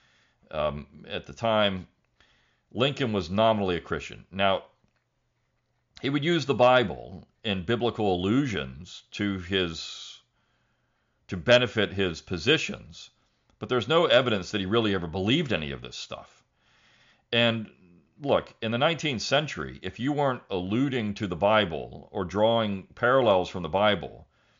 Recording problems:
high frequencies cut off; noticeable; nothing above 7 kHz

